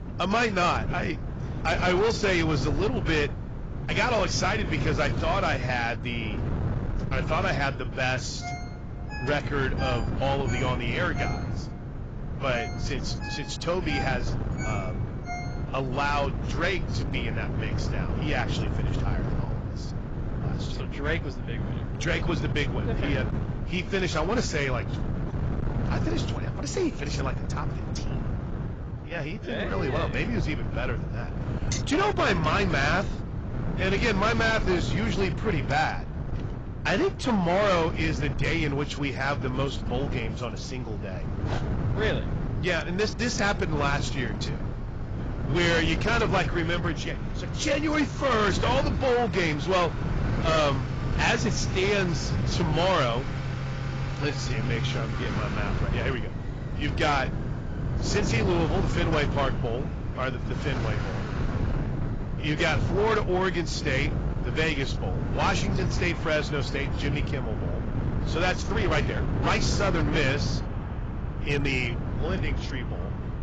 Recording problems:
garbled, watery; badly; nothing above 7.5 kHz
distortion; slight; 7% of the sound clipped
traffic noise; noticeable; throughout; 10 dB below the speech
wind noise on the microphone; occasional gusts; 10 dB below the speech
phone ringing; noticeable; from 8.5 to 16 s; peak 9 dB below the speech
uneven, jittery; strongly; from 29 s to 1:10
clattering dishes; noticeable; at 32 s; peak 7 dB below the speech
dog barking; faint; at 41 s; peak 10 dB below the speech

